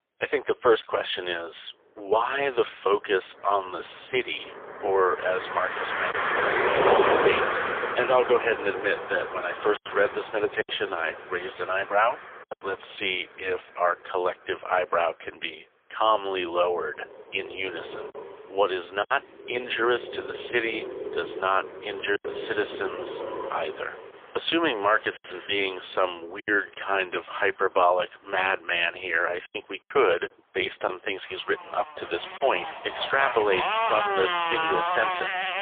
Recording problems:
phone-call audio; poor line; nothing above 3.5 kHz
traffic noise; loud; throughout; 2 dB below the speech
choppy; occasionally; 3% of the speech affected

